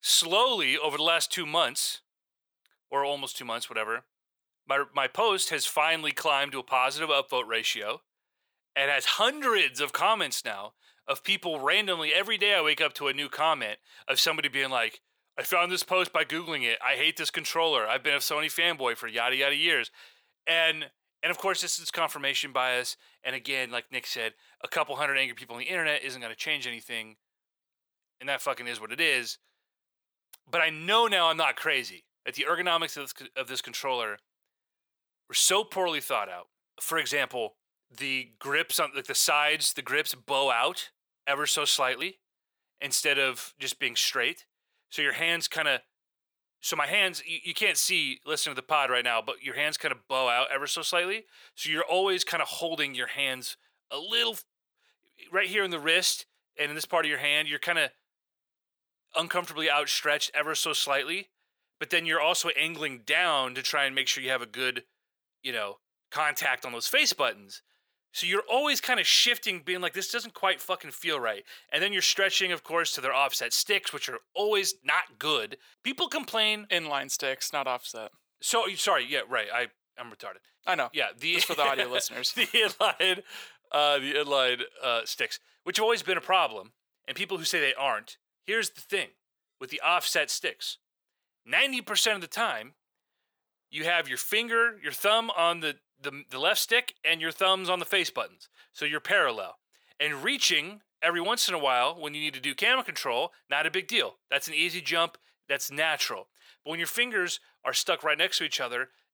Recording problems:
thin; very; fading below 550 Hz

